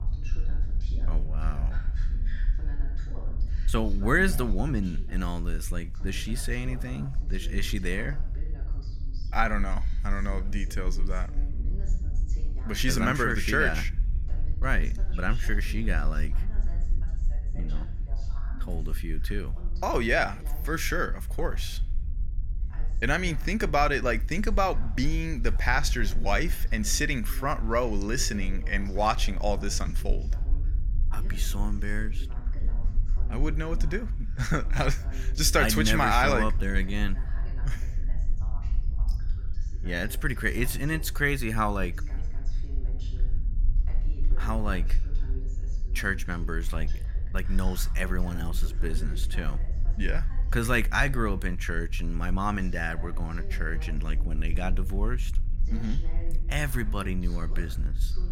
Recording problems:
voice in the background; noticeable; throughout; 20 dB below the speech
low rumble; faint; throughout; 25 dB below the speech

